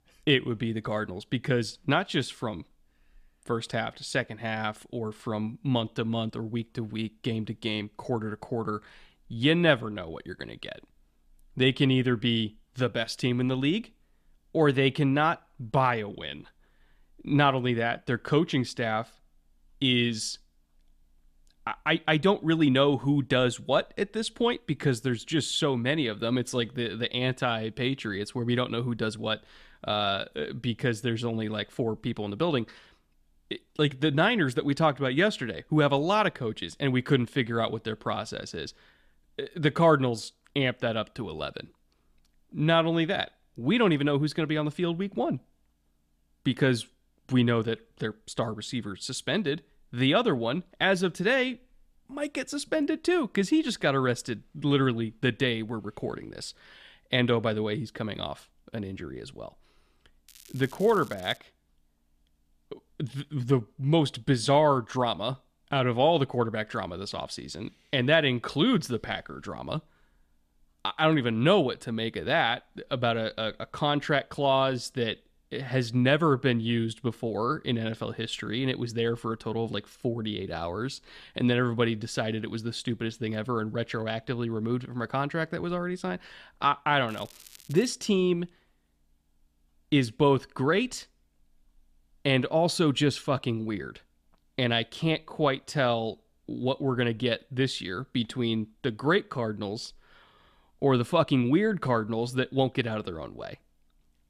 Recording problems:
crackling; faint; from 1:00 to 1:01 and at 1:27; 25 dB below the speech

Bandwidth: 14.5 kHz